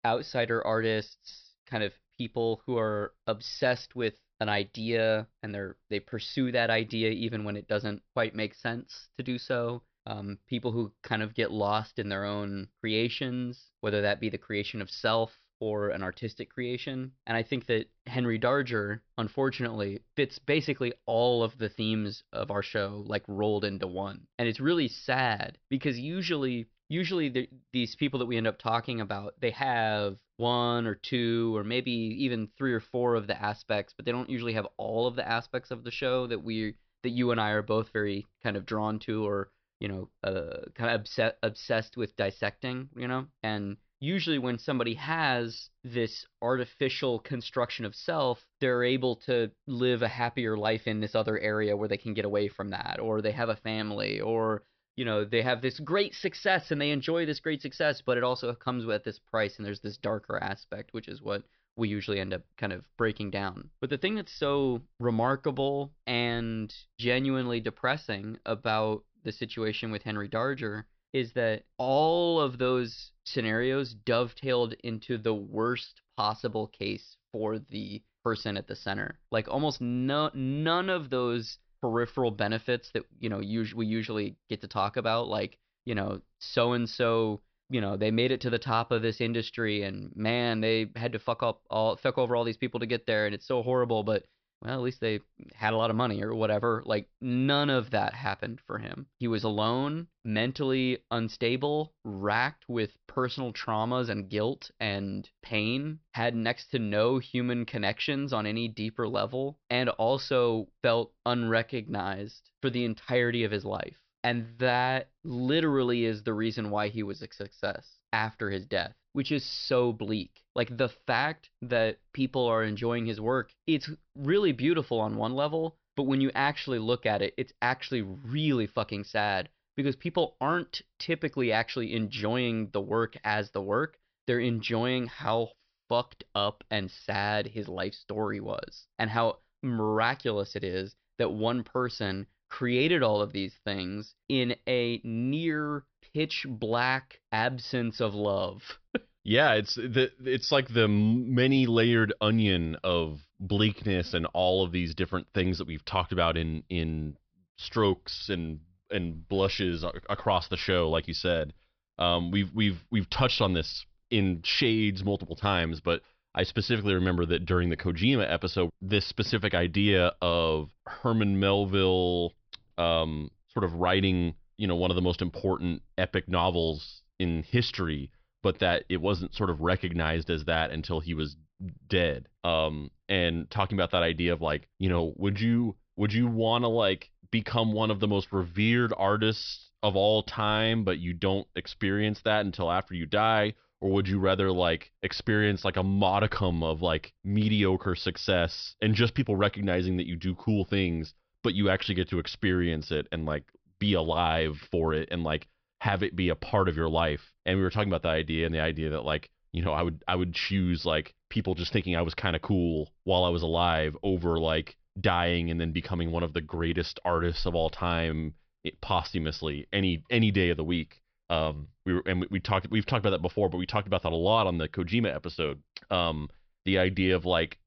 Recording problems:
high frequencies cut off; noticeable; nothing above 5.5 kHz

